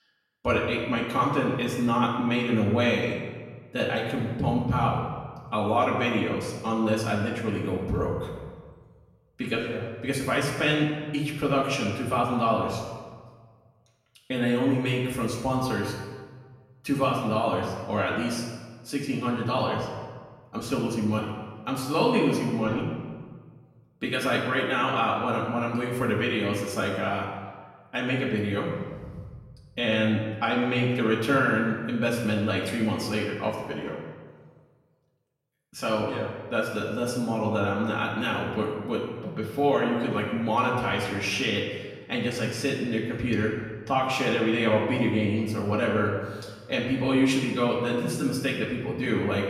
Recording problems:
off-mic speech; far
room echo; noticeable; dies away in 1.2 s

